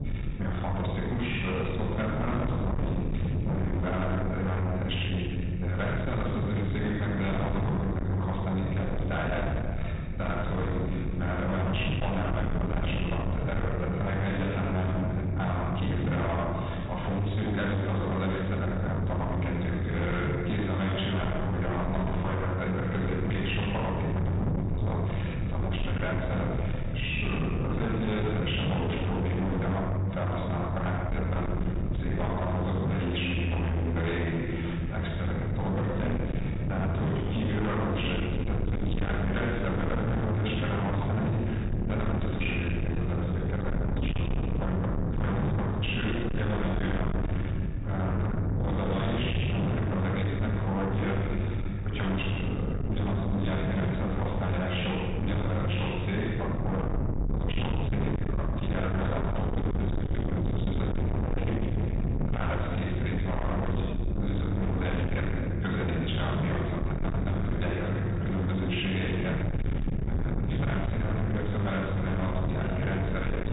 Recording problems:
distortion; heavy; 6 dB below the speech
off-mic speech; far
high frequencies cut off; severe; nothing above 4 kHz
room echo; noticeable; dies away in 1.8 s
low rumble; loud; throughout; 7 dB below the speech

